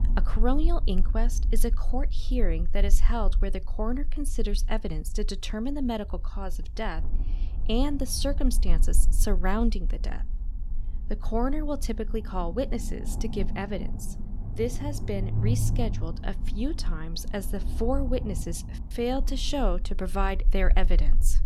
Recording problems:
low rumble; noticeable; throughout; 15 dB below the speech

